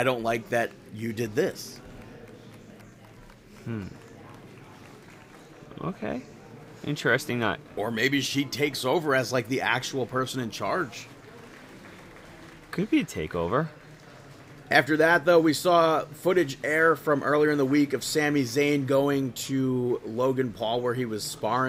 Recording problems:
murmuring crowd; faint; throughout; 20 dB below the speech
abrupt cut into speech; at the start and the end

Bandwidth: 15.5 kHz